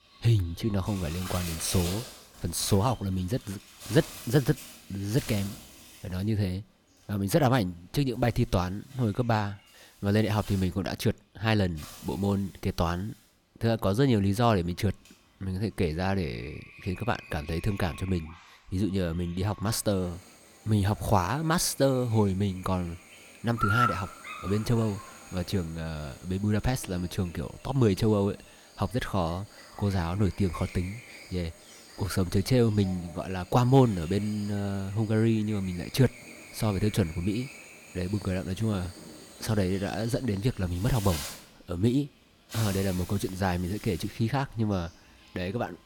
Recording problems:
animal sounds; noticeable; throughout; 15 dB below the speech

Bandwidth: 18.5 kHz